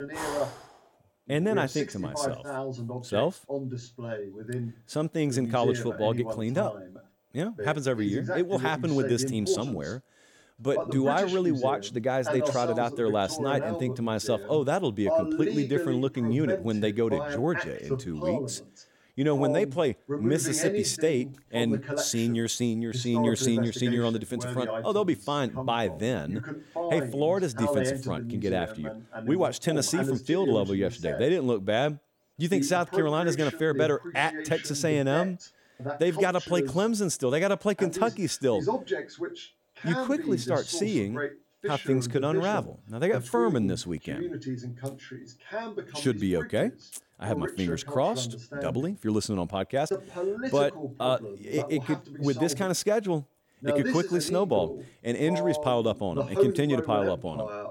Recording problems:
voice in the background; loud; throughout; 5 dB below the speech

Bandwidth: 16.5 kHz